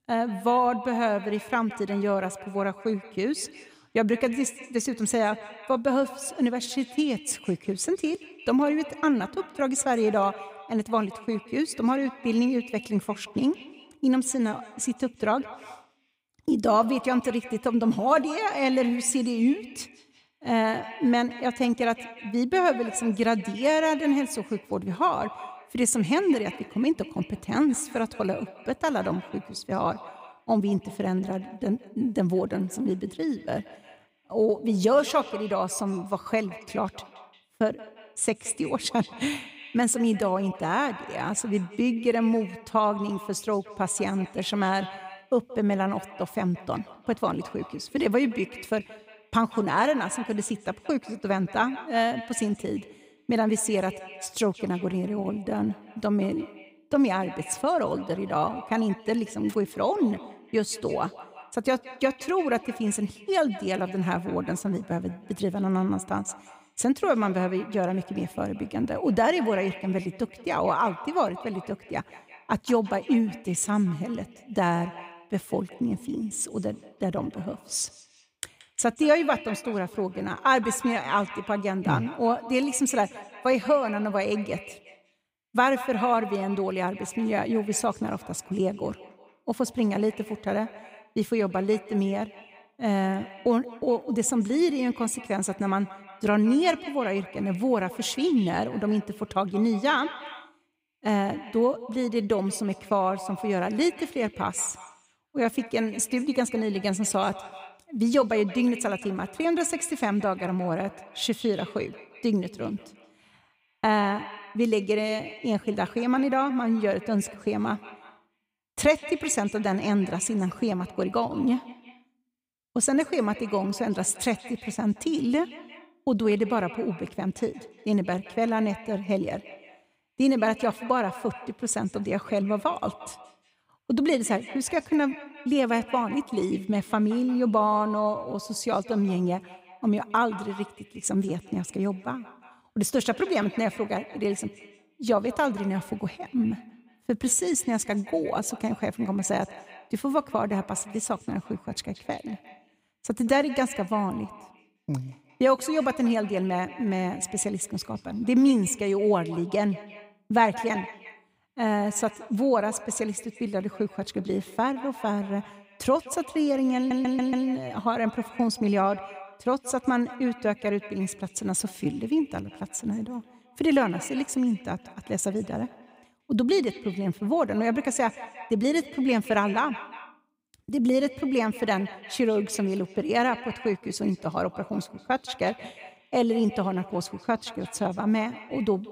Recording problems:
echo of what is said; noticeable; throughout; 180 ms later, 15 dB below the speech
audio stuttering; at 2:47

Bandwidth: 15.5 kHz